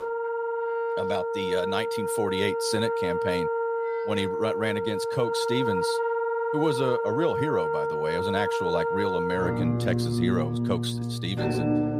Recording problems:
background music; very loud; throughout; 3 dB above the speech

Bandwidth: 15 kHz